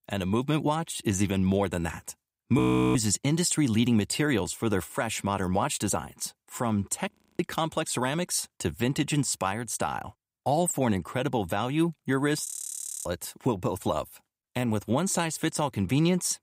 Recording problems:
audio freezing; at 2.5 s, at 7 s and at 12 s for 0.5 s

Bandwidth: 15.5 kHz